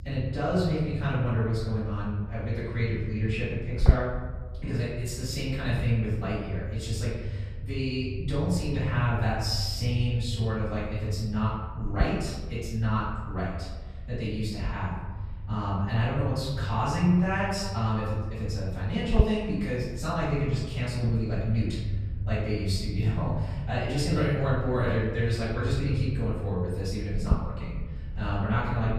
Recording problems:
off-mic speech; far
room echo; noticeable; dies away in 1.1 s
low rumble; noticeable; throughout; 15 dB below the speech

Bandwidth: 15 kHz